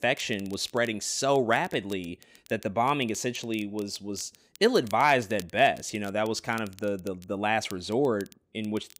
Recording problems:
crackle, like an old record; faint; 25 dB below the speech

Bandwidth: 15.5 kHz